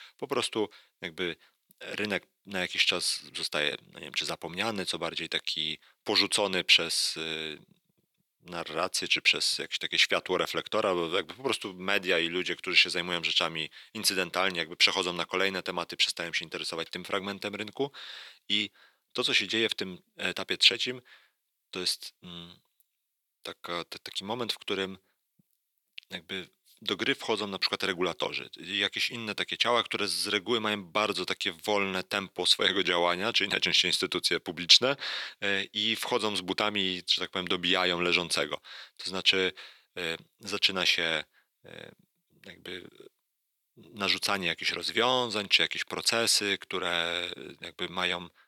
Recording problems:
thin; somewhat; fading below 350 Hz

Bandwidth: 18.5 kHz